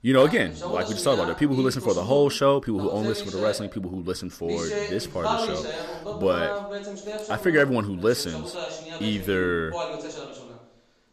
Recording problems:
voice in the background; loud; throughout; 8 dB below the speech

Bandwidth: 14 kHz